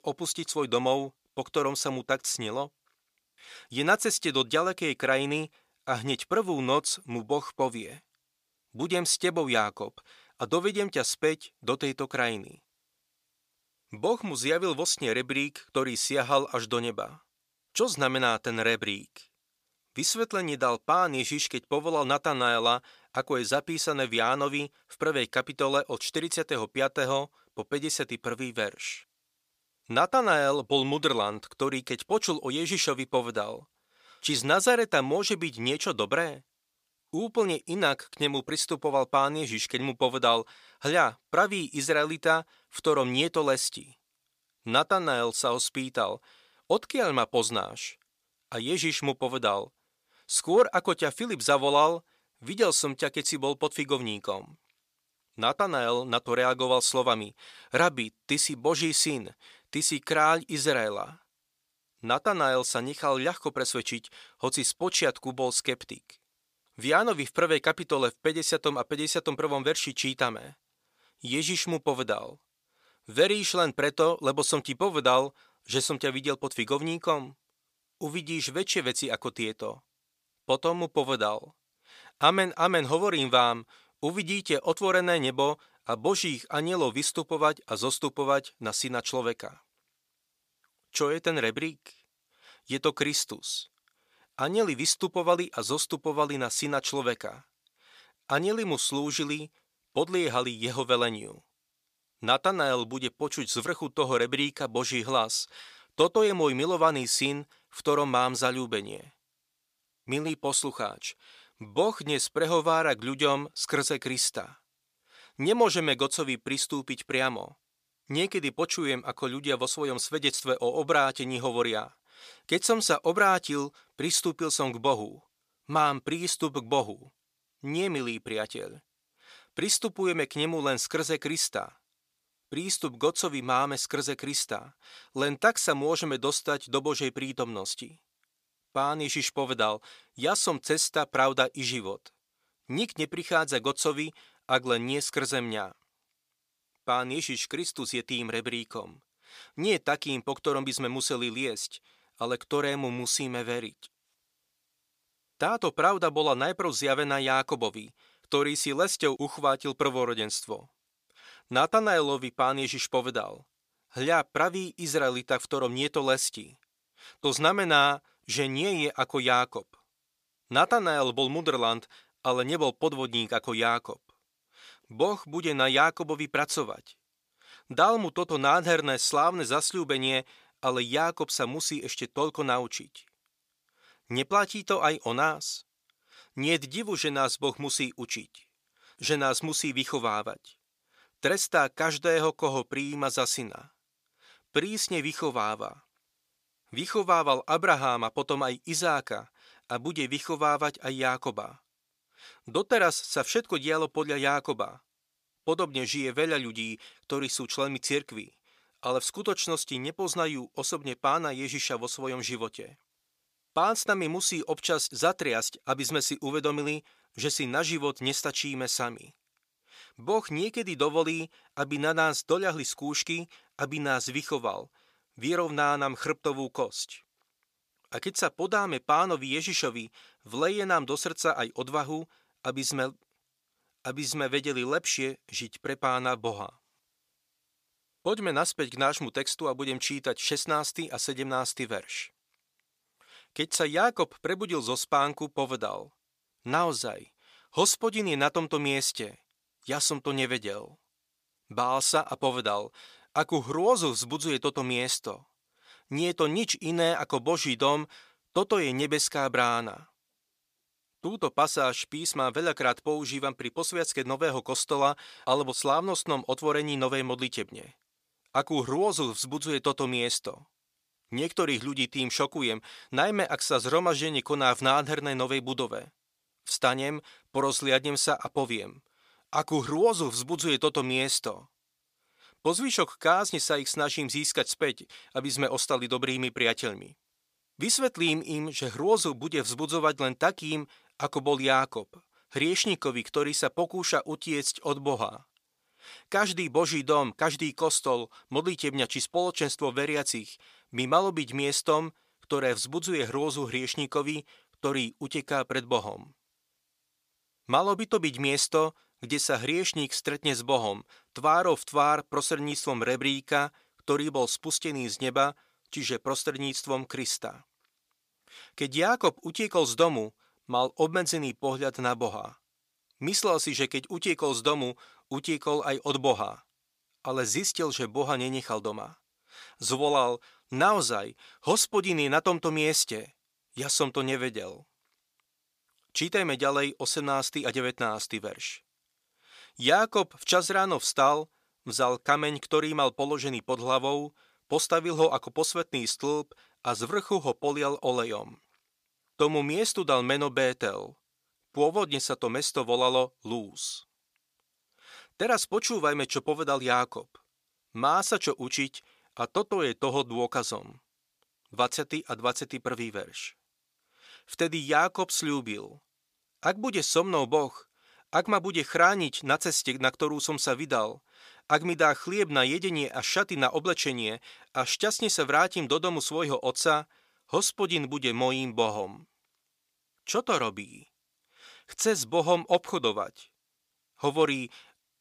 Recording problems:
thin; somewhat; fading below 650 Hz

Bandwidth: 15 kHz